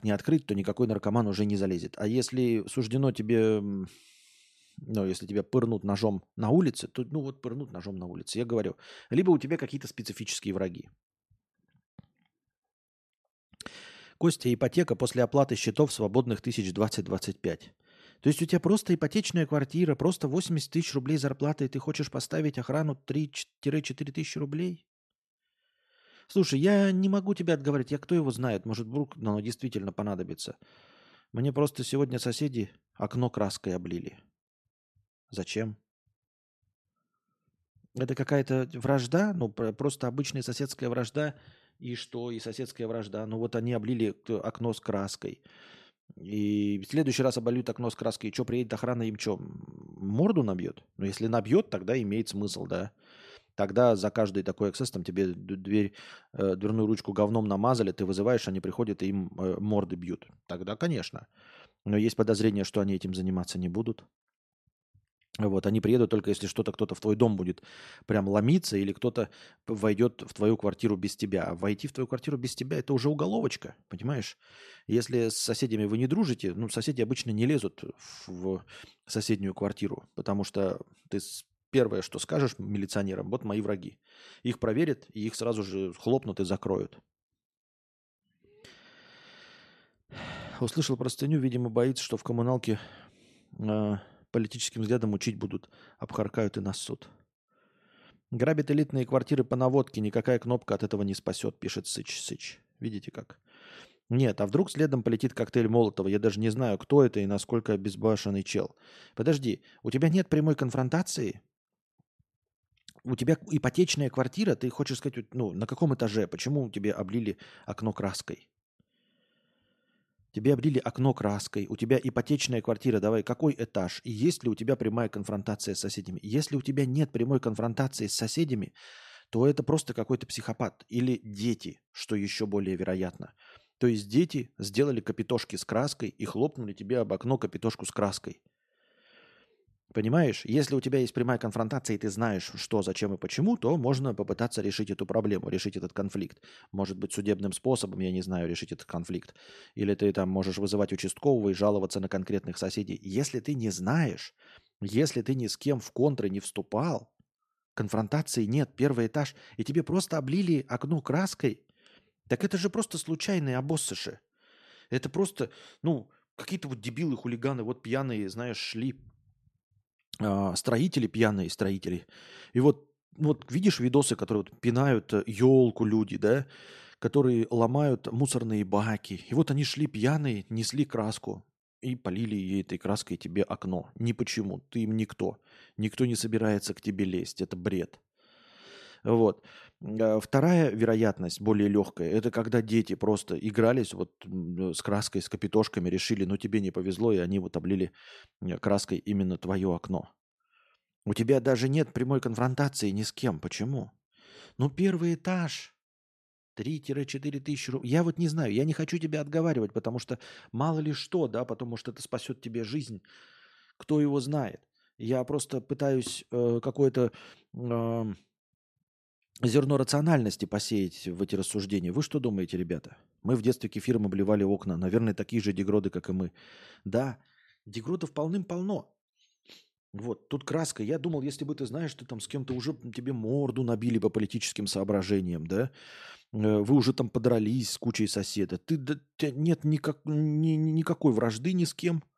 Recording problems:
none

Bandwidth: 13.5 kHz